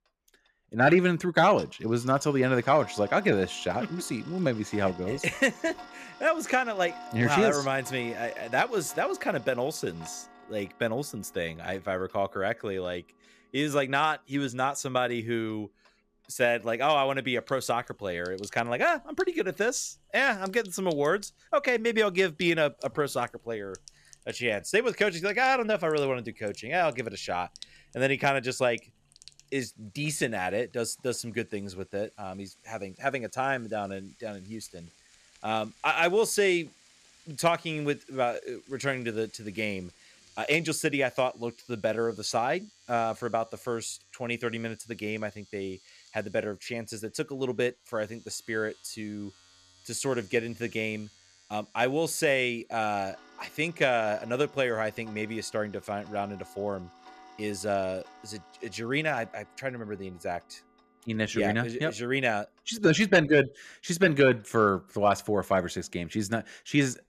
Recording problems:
household noises; faint; throughout; 25 dB below the speech

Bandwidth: 14.5 kHz